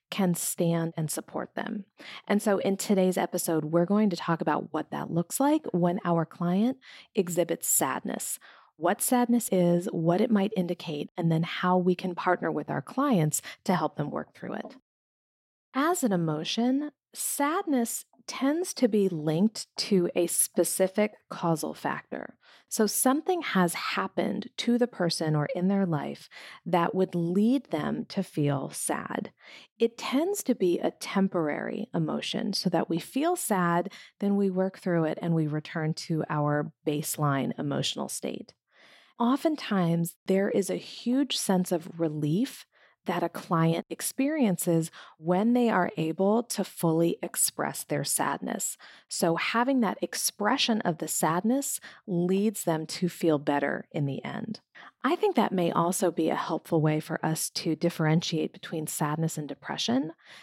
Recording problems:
none

